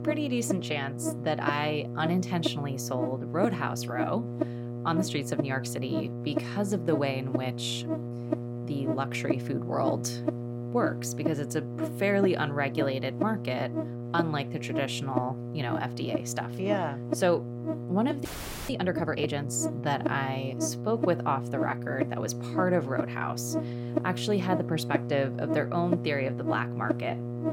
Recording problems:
electrical hum; loud; throughout; 60 Hz, 6 dB below the speech
audio freezing; at 18 s

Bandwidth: 16 kHz